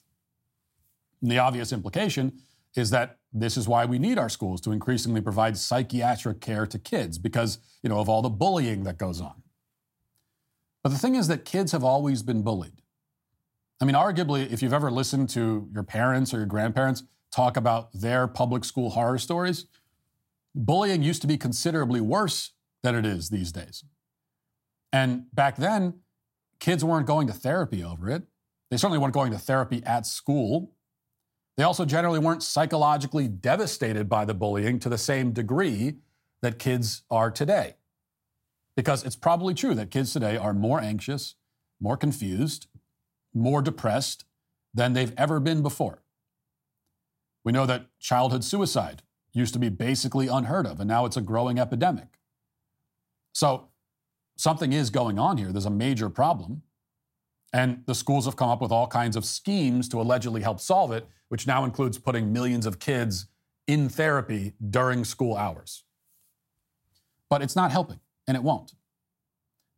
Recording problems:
none

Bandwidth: 16 kHz